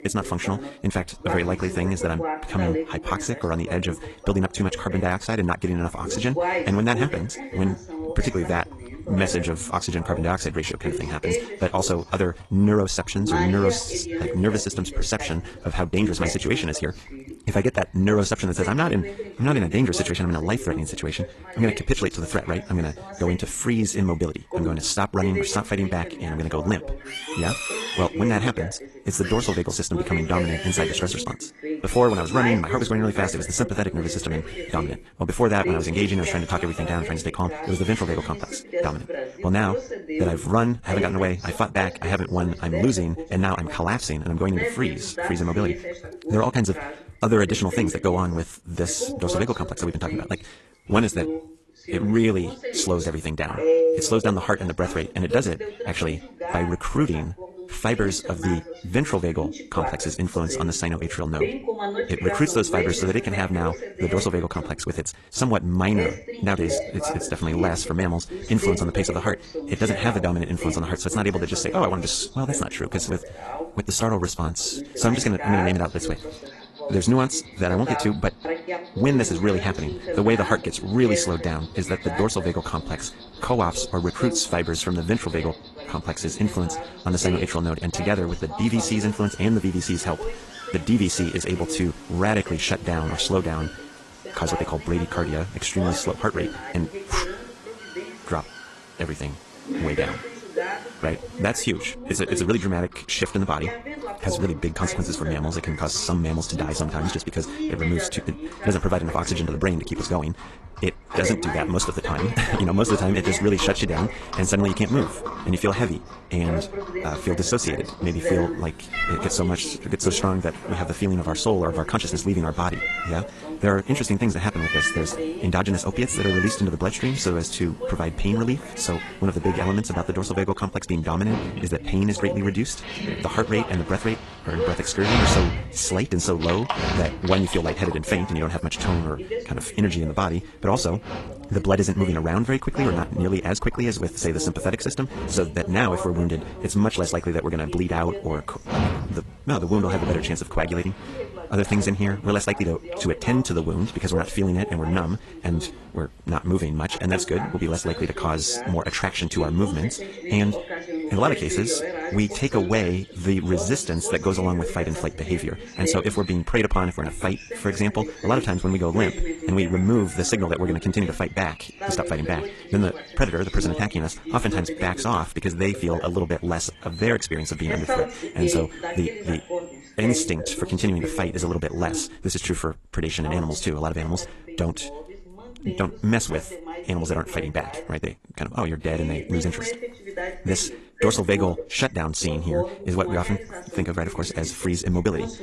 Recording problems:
wrong speed, natural pitch; too fast; 1.6 times normal speed
garbled, watery; slightly; nothing above 11 kHz
voice in the background; loud; throughout; 8 dB below the speech
animal sounds; noticeable; throughout; 10 dB below the speech

